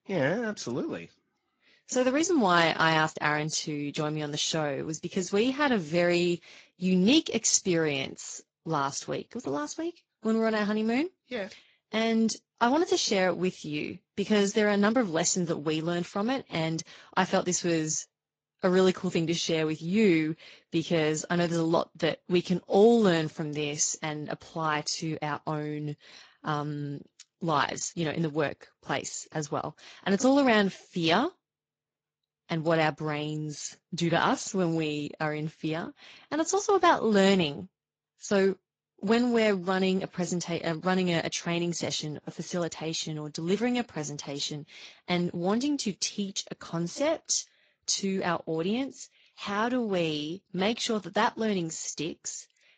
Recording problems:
garbled, watery; slightly; nothing above 7.5 kHz

